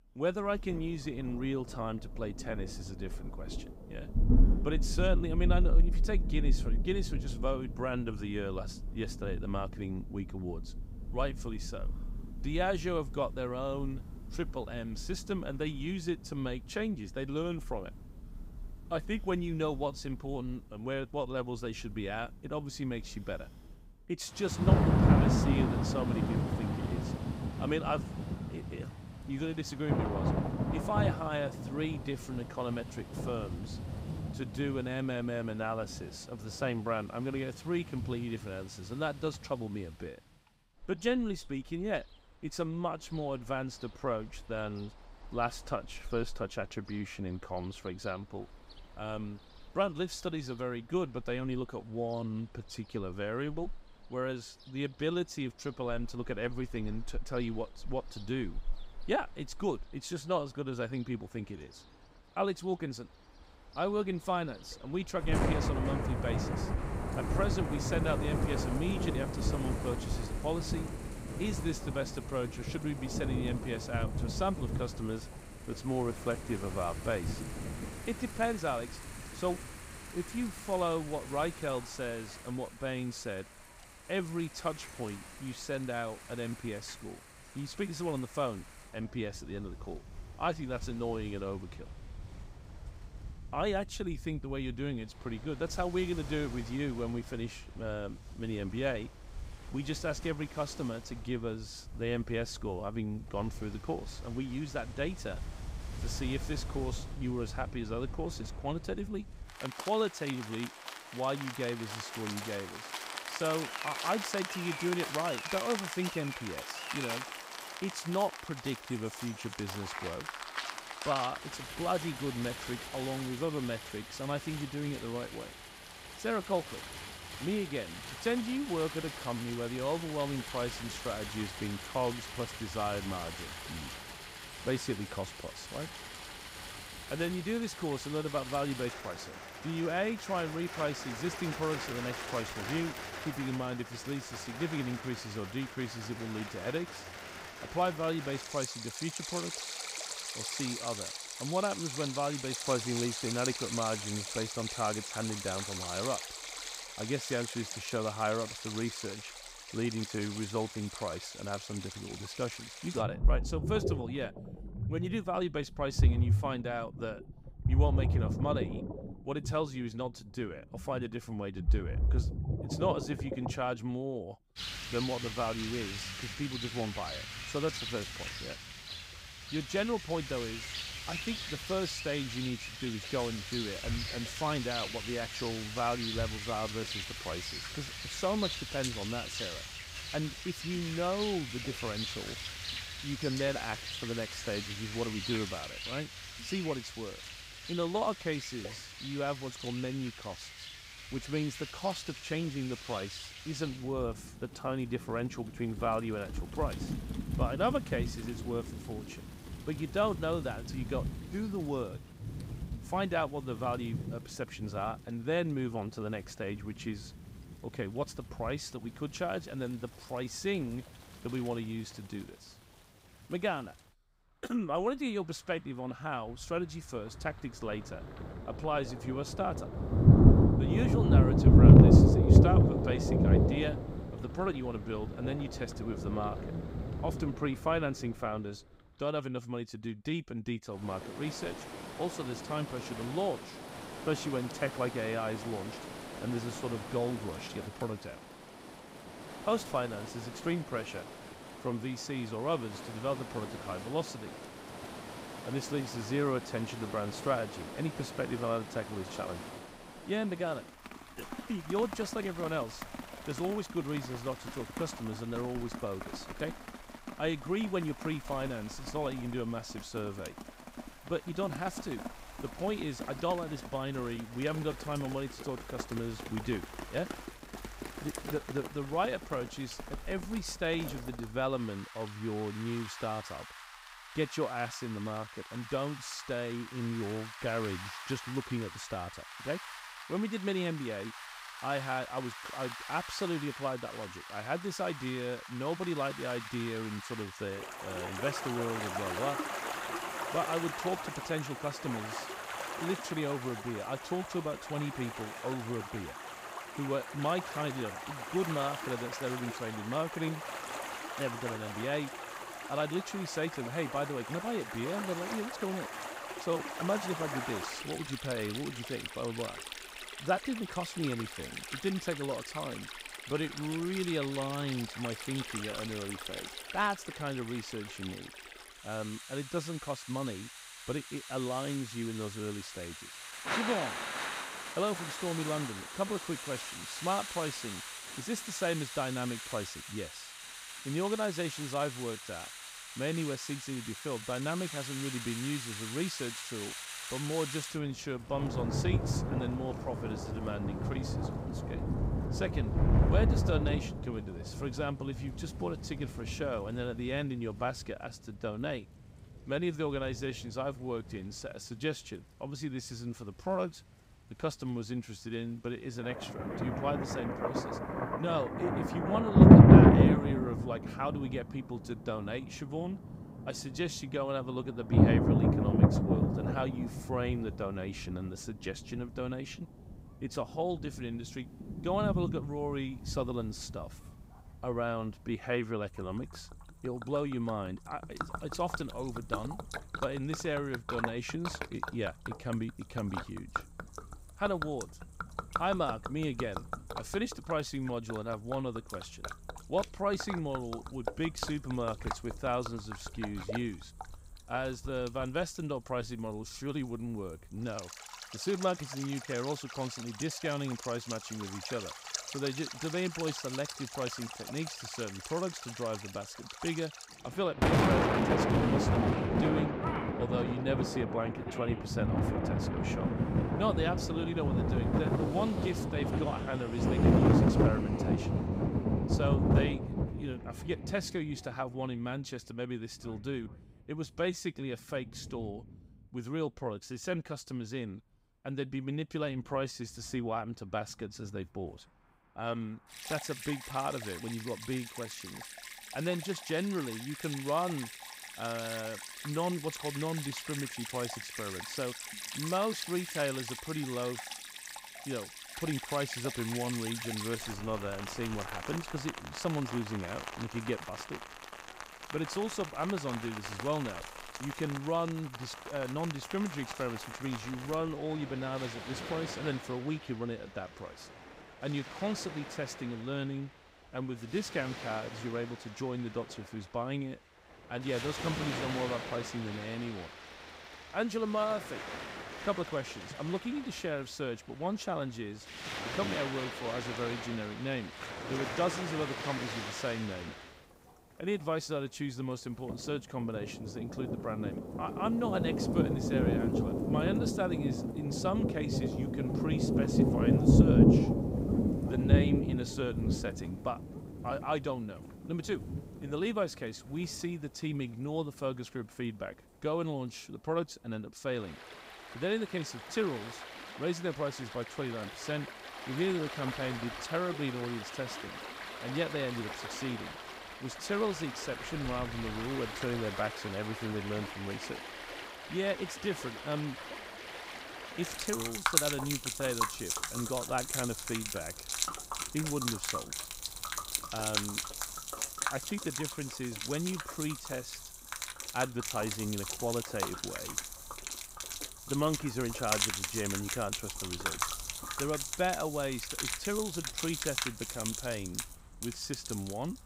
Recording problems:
rain or running water; very loud; throughout; 2 dB above the speech

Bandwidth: 15.5 kHz